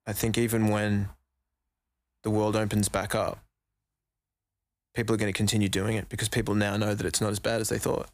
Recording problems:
none

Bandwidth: 15 kHz